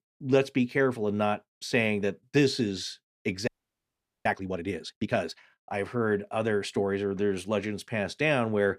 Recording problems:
audio freezing; at 3.5 s for 1 s

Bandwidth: 15 kHz